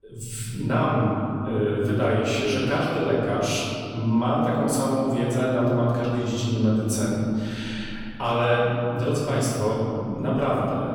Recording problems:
room echo; strong; dies away in 3 s
off-mic speech; far

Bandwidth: 18.5 kHz